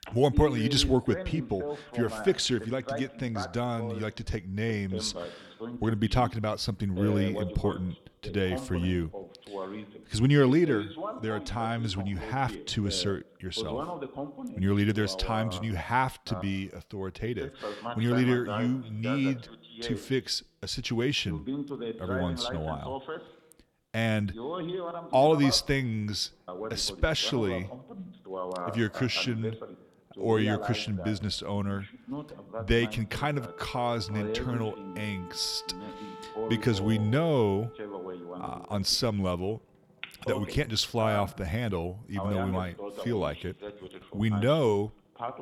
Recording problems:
voice in the background; loud; throughout; 10 dB below the speech
background music; faint; from 18 s on; 20 dB below the speech

